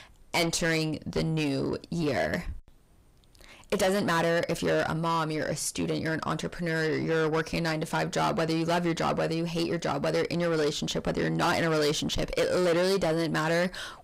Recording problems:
distortion; heavy; 7 dB below the speech

